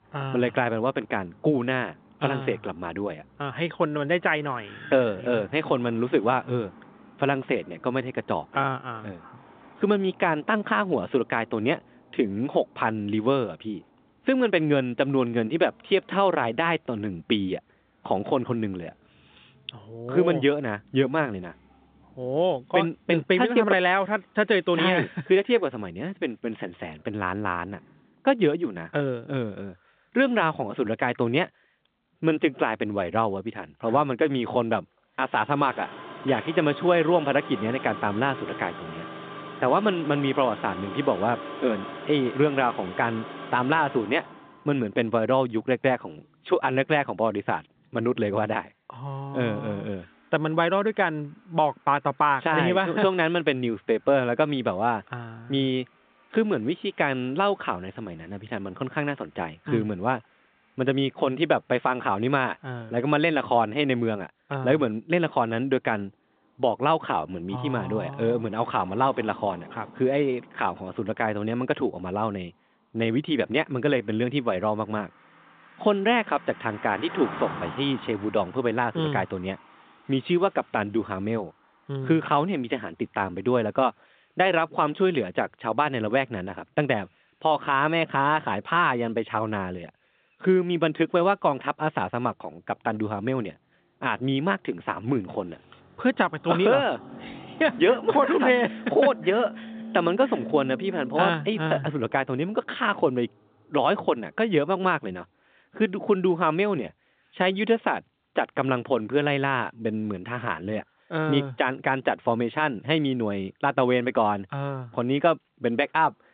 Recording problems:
phone-call audio; nothing above 3.5 kHz
traffic noise; noticeable; throughout; 15 dB below the speech

